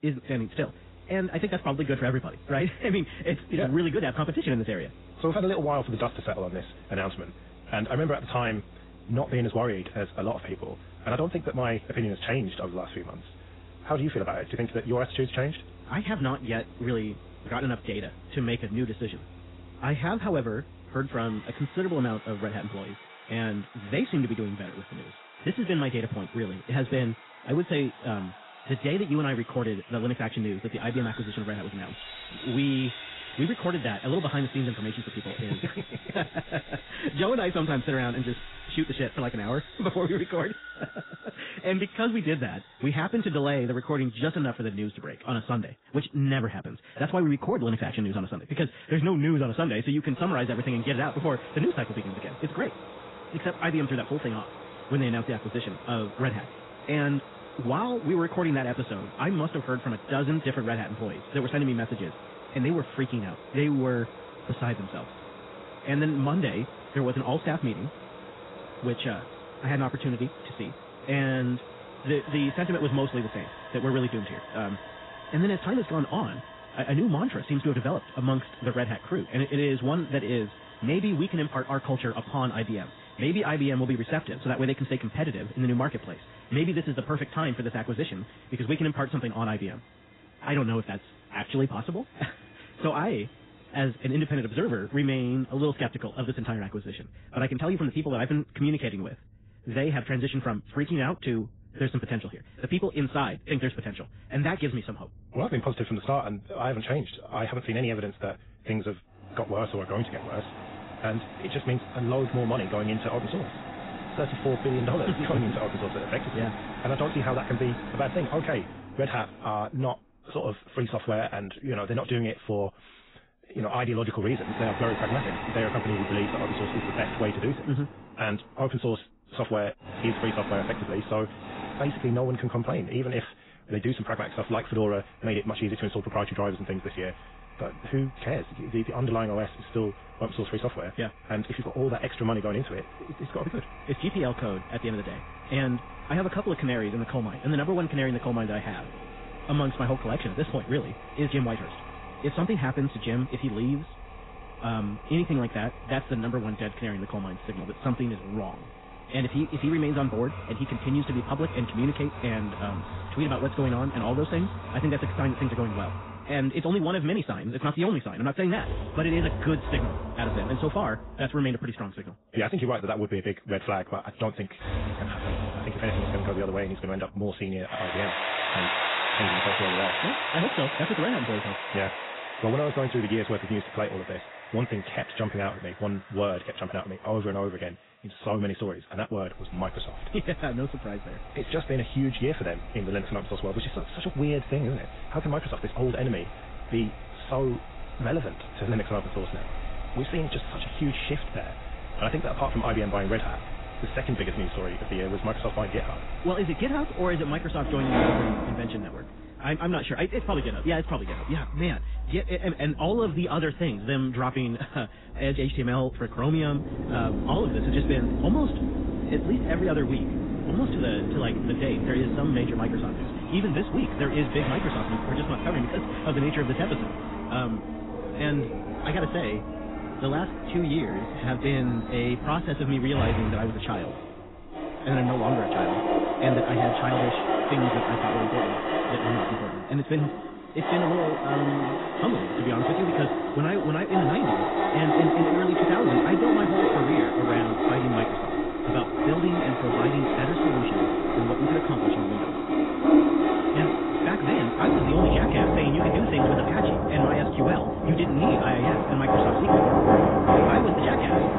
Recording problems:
garbled, watery; badly; nothing above 4 kHz
wrong speed, natural pitch; too fast; 1.5 times normal speed
machinery noise; loud; throughout; as loud as the speech

